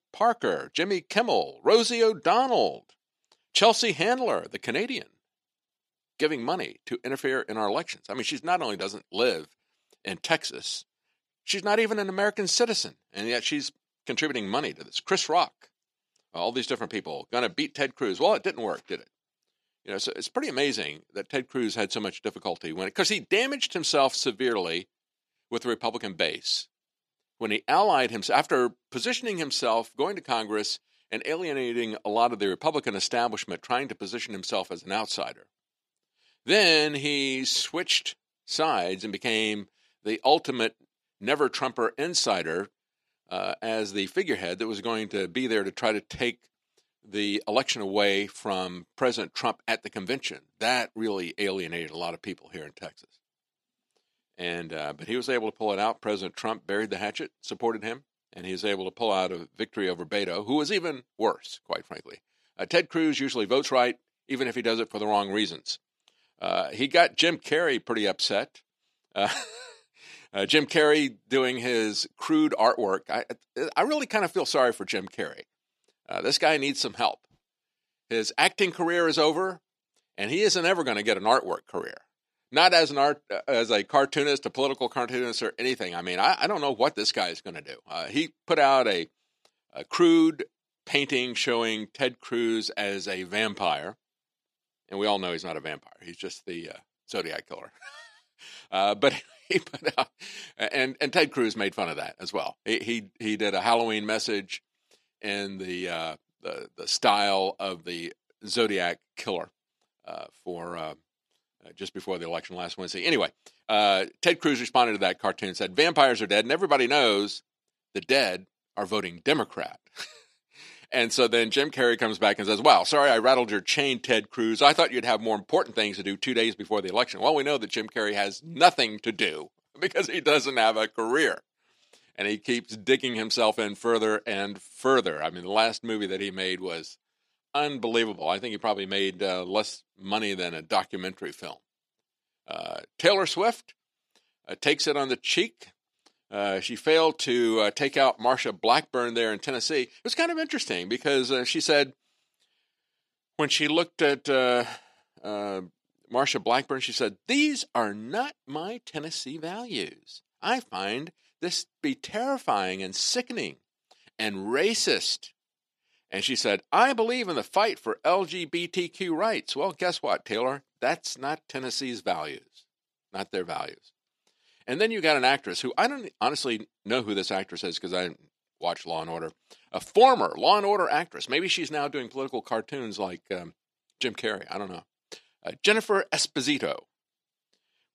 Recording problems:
thin; somewhat; fading below 300 Hz

